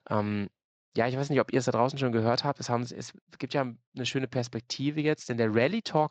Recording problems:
garbled, watery; slightly; nothing above 7.5 kHz

